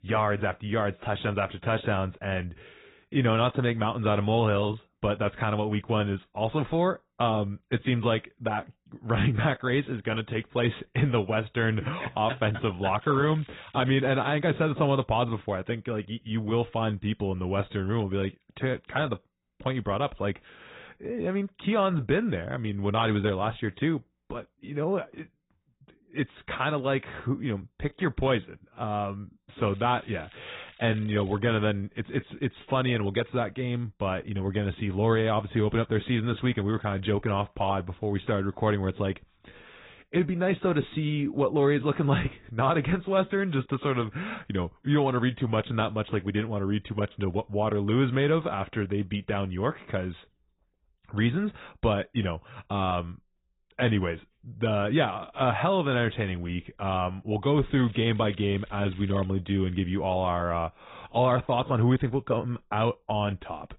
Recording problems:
high frequencies cut off; severe; nothing above 4 kHz
garbled, watery; slightly
crackling; faint; from 13 to 14 s, from 30 to 31 s and from 58 to 59 s; 25 dB below the speech

